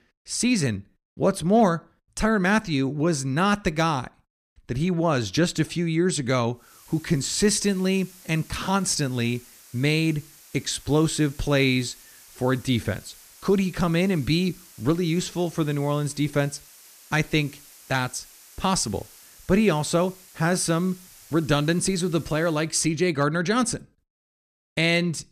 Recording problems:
hiss; faint; from 6.5 to 23 s; 25 dB below the speech

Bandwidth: 14.5 kHz